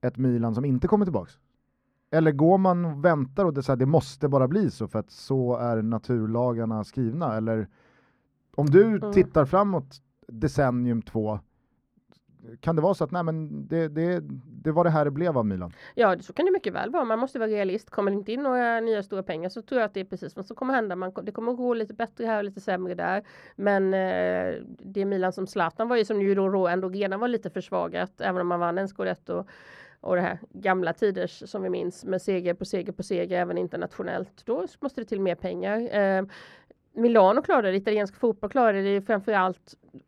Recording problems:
muffled; slightly; fading above 2.5 kHz

